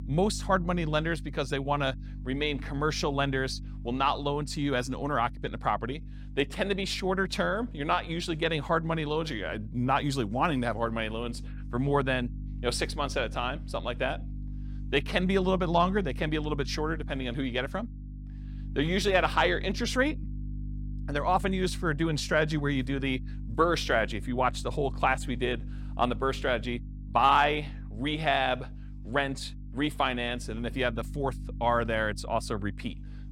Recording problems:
electrical hum; faint; throughout; 50 Hz, 25 dB below the speech

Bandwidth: 16.5 kHz